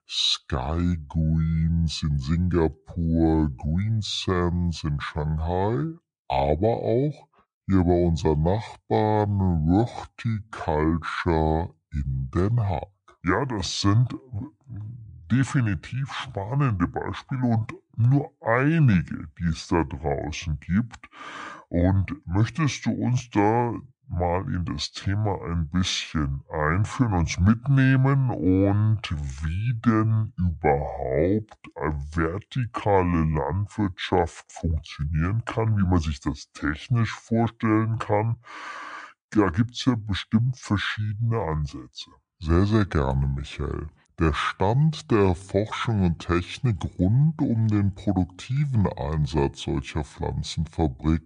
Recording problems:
wrong speed and pitch; too slow and too low; 0.7 times normal speed

